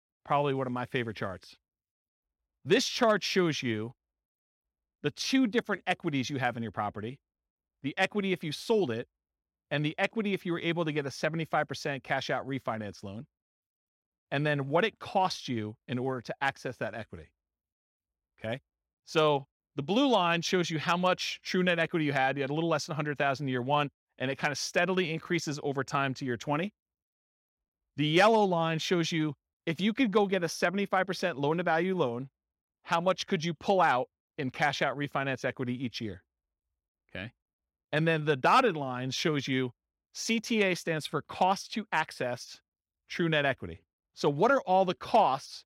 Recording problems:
none

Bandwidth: 16 kHz